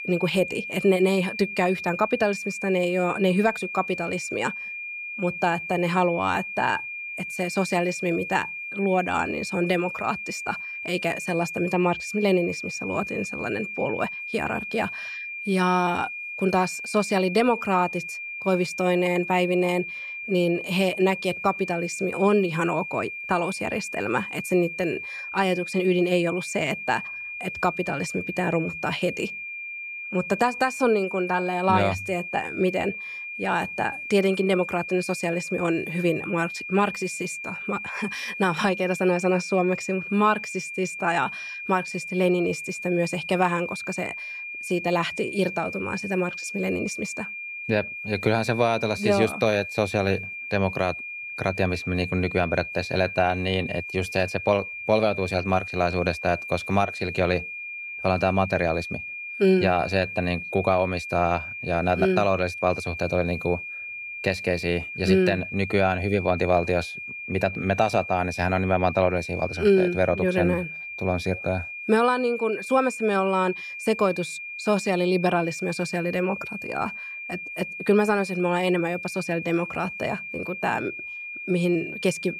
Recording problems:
high-pitched whine; loud; throughout; 2.5 kHz, 7 dB below the speech

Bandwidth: 14.5 kHz